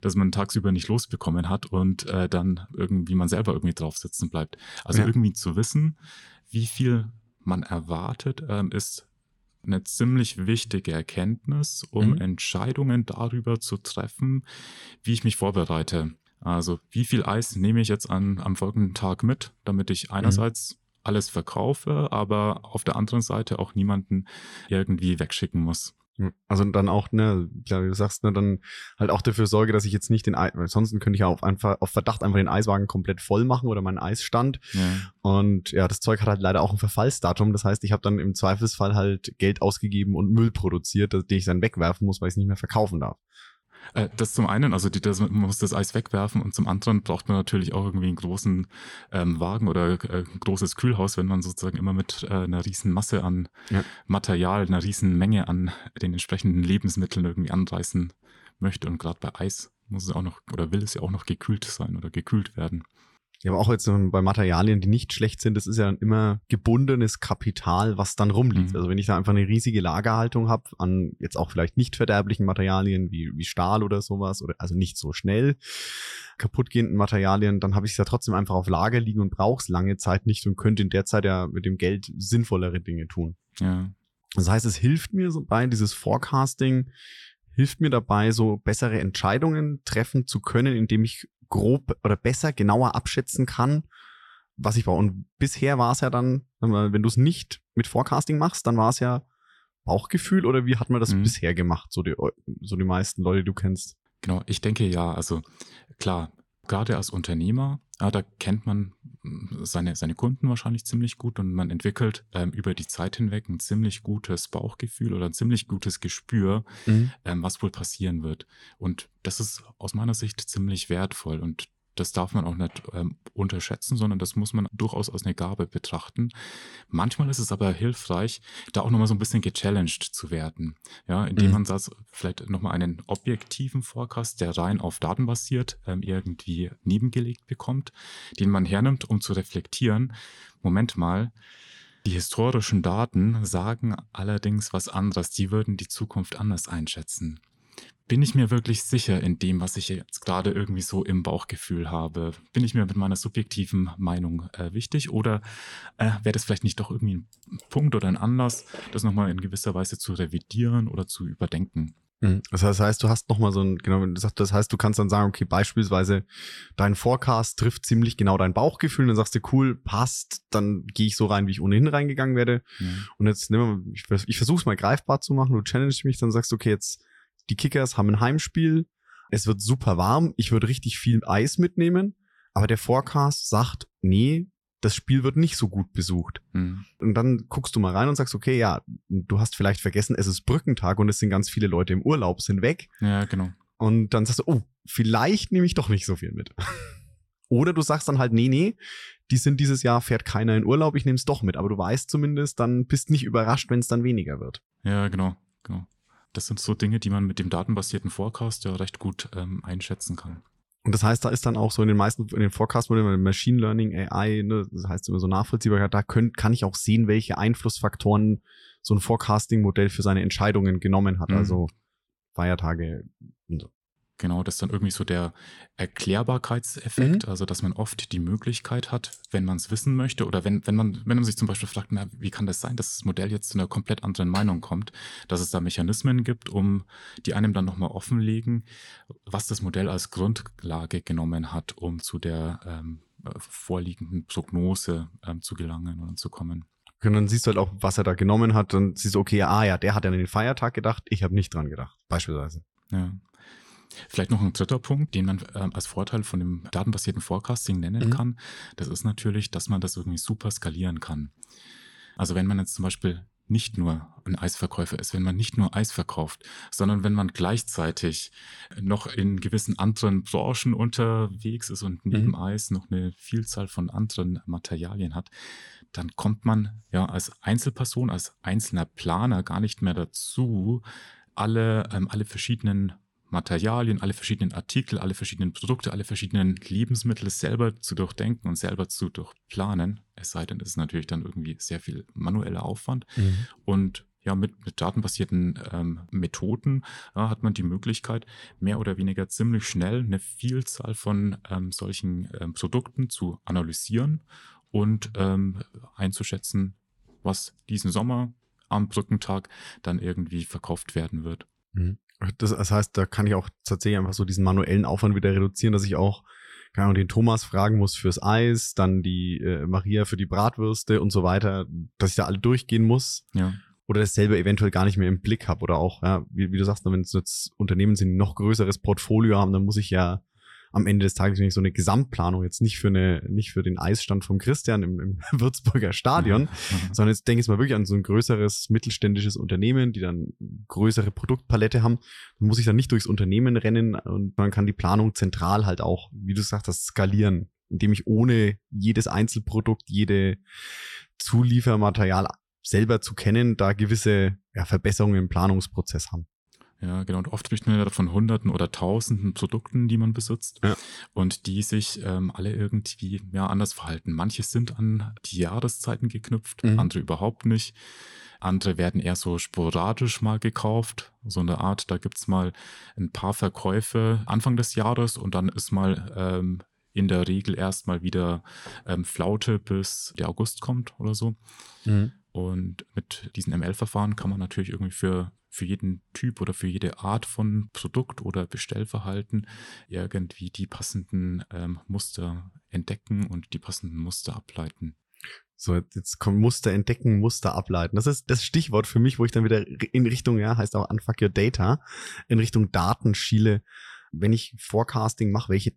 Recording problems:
uneven, jittery; strongly; from 29 s to 6:06

